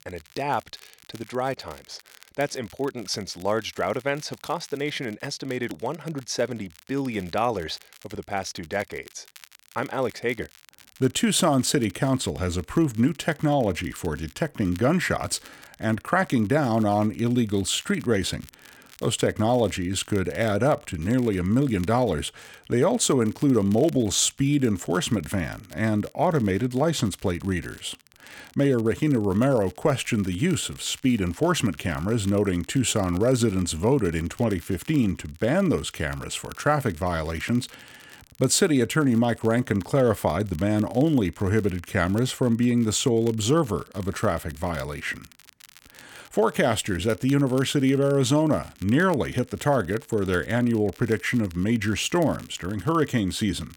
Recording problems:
crackle, like an old record; faint; 25 dB below the speech

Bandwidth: 18 kHz